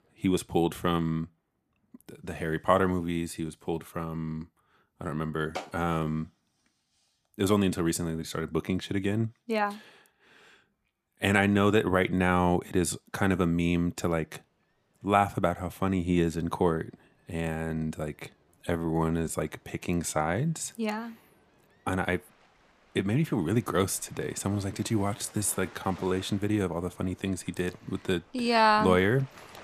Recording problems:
rain or running water; faint; throughout; 30 dB below the speech
uneven, jittery; strongly; from 5 to 26 s

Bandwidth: 14.5 kHz